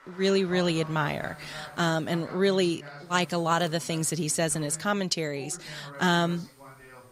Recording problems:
voice in the background; noticeable; throughout; 20 dB below the speech
electrical hum; faint; from 1 to 2 s, from 3 to 5 s and from 6 s on; 60 Hz, 30 dB below the speech
crowd noise; faint; throughout; 25 dB below the speech

